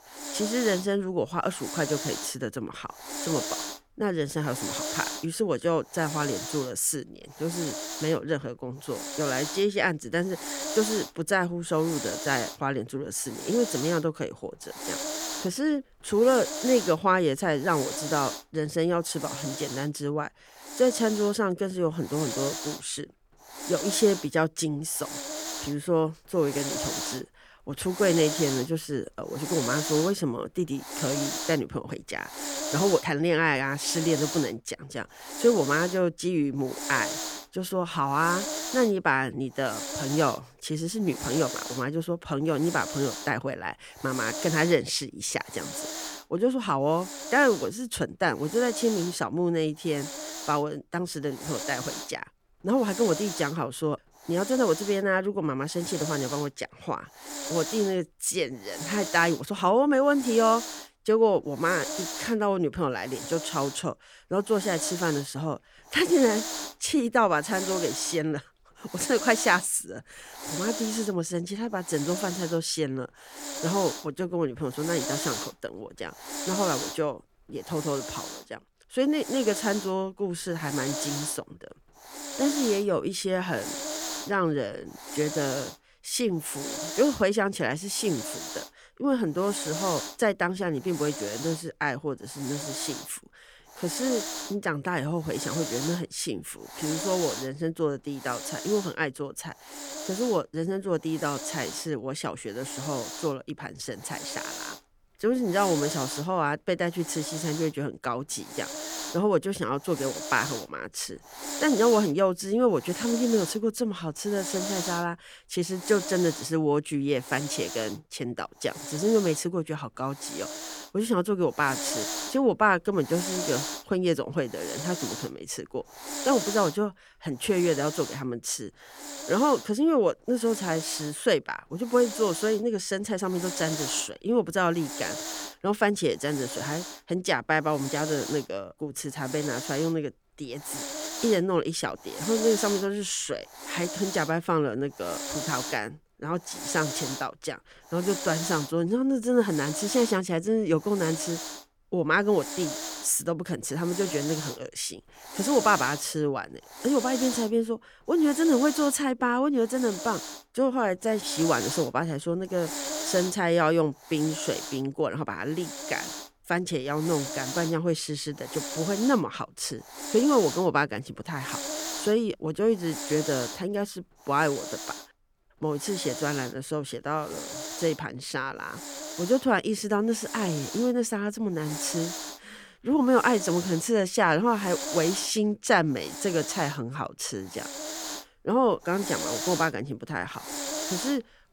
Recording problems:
hiss; loud; throughout; 7 dB below the speech

